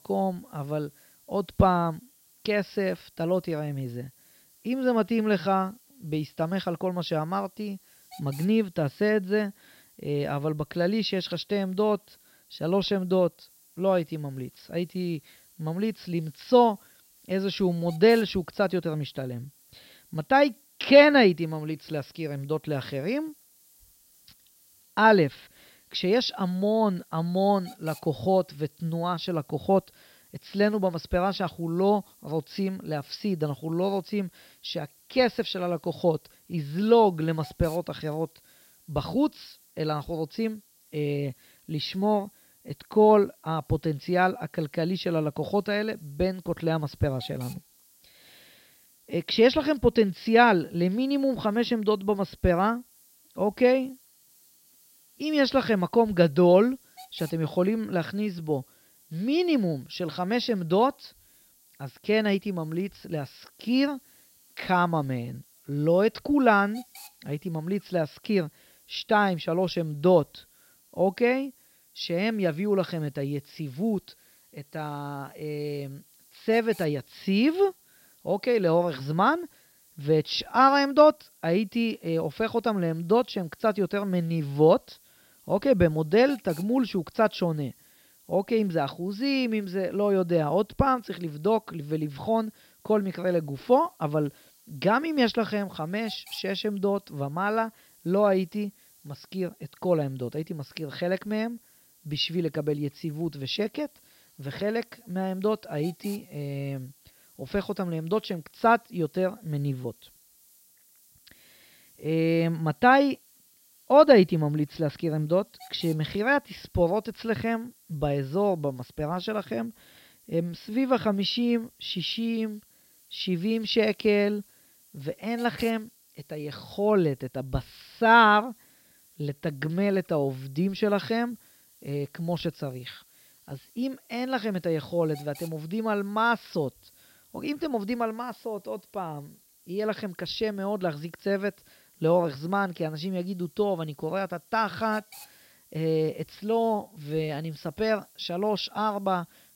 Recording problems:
high frequencies cut off; noticeable; nothing above 5.5 kHz
hiss; faint; throughout; 30 dB below the speech

